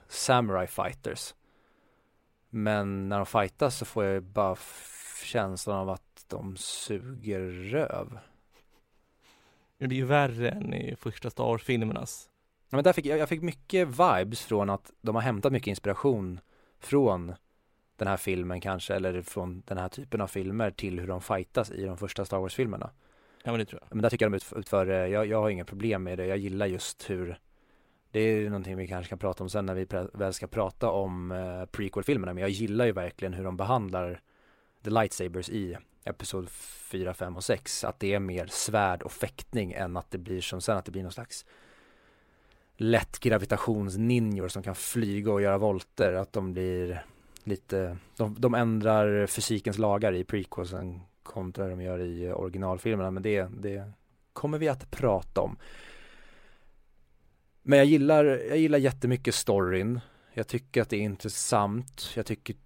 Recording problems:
uneven, jittery; strongly; from 2.5 s to 1:02

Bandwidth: 16 kHz